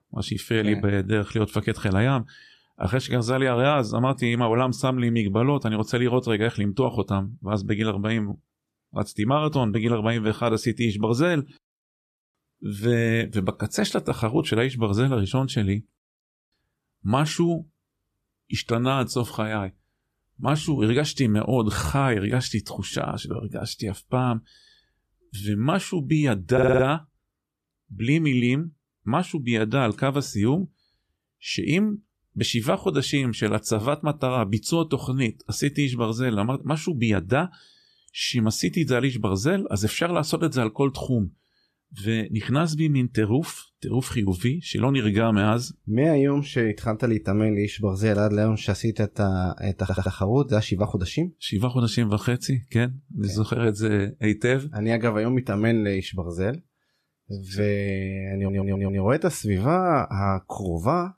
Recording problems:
audio stuttering; at 27 s, at 50 s and at 58 s

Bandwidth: 14 kHz